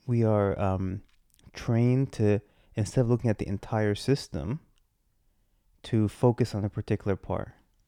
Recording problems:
none

